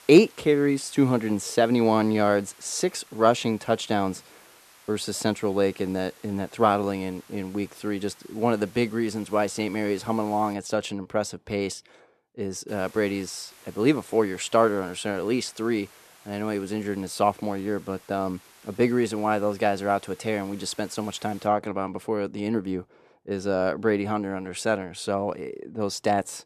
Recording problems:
hiss; faint; until 11 s and from 13 to 21 s; 25 dB below the speech

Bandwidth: 13.5 kHz